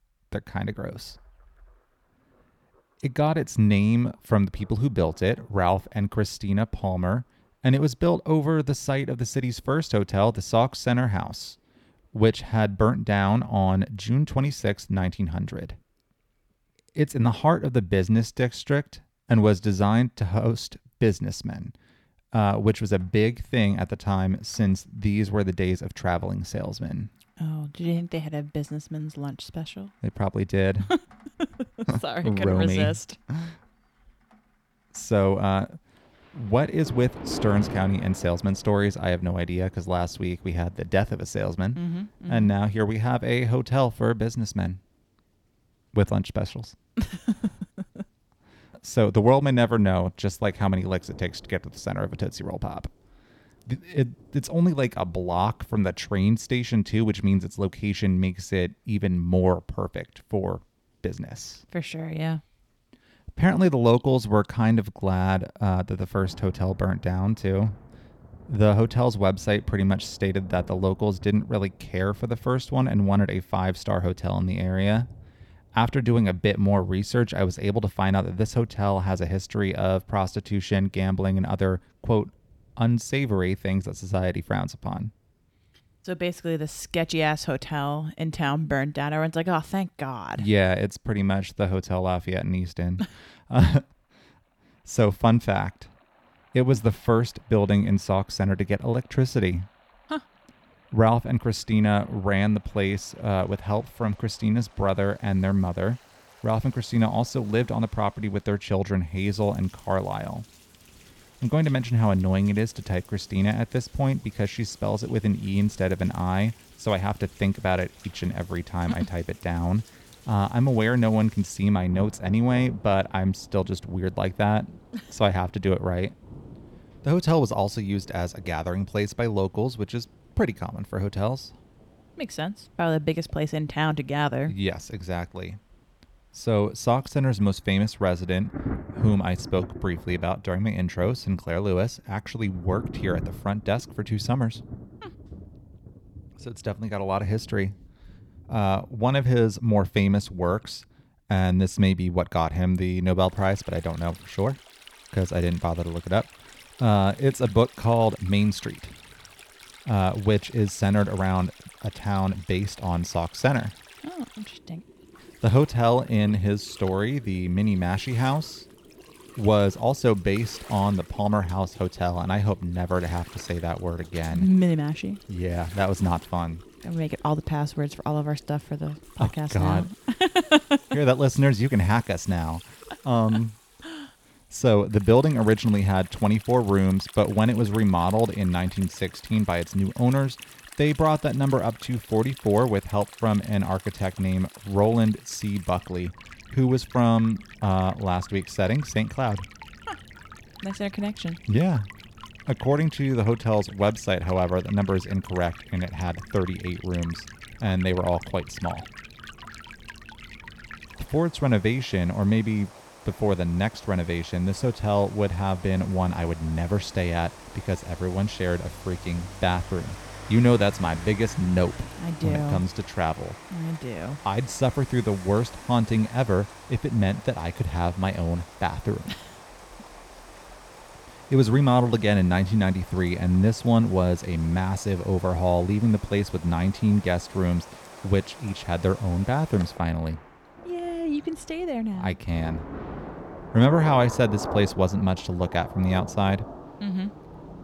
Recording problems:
rain or running water; noticeable; throughout; 20 dB below the speech

